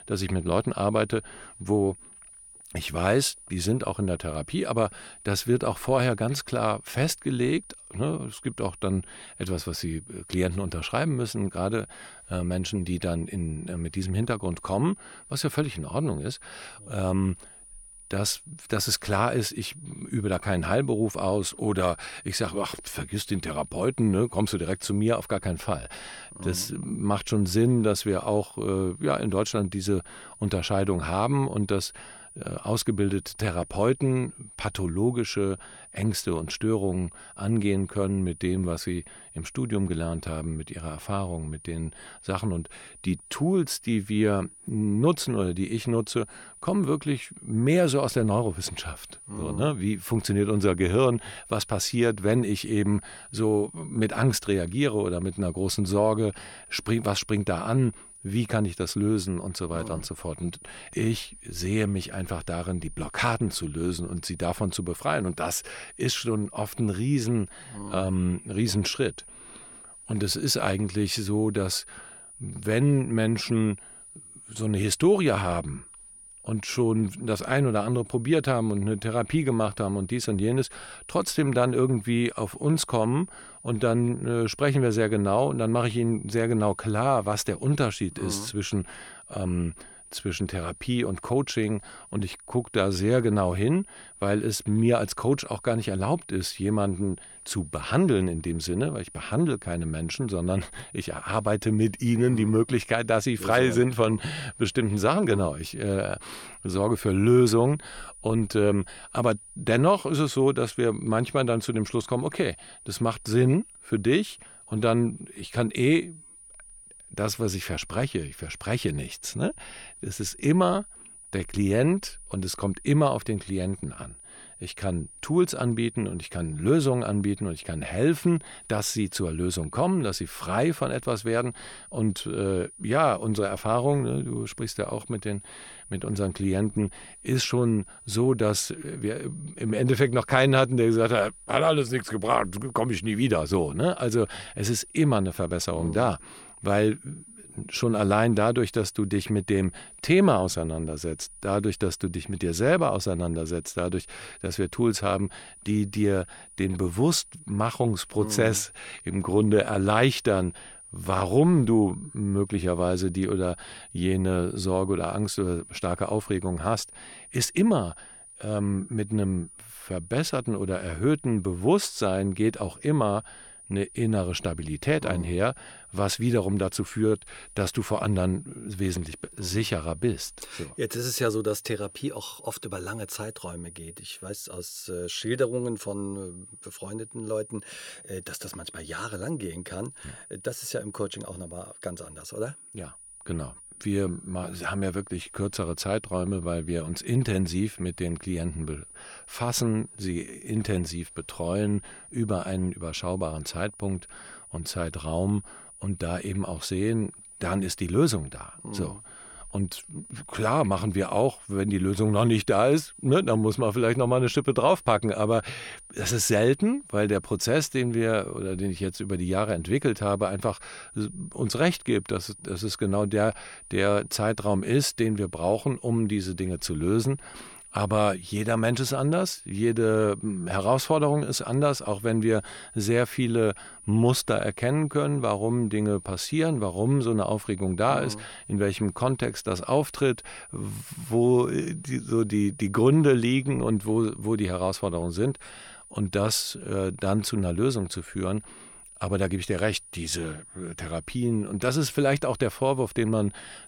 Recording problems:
high-pitched whine; noticeable; throughout; 9.5 kHz, 20 dB below the speech

